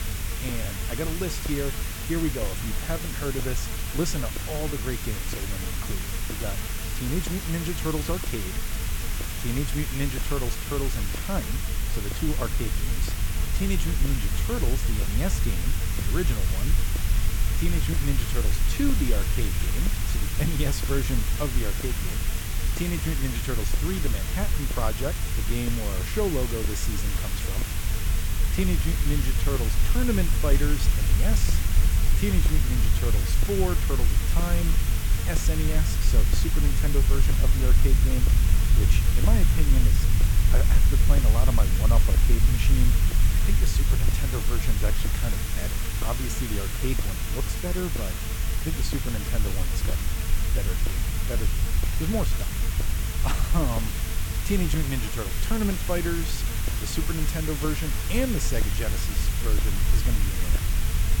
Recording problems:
hiss; loud; throughout; 2 dB below the speech
electrical hum; noticeable; throughout; 50 Hz, 10 dB below the speech
low rumble; noticeable; throughout; 10 dB below the speech

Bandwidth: 17 kHz